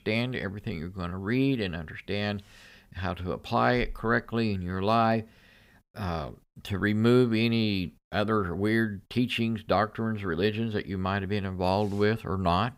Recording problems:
none

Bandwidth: 15.5 kHz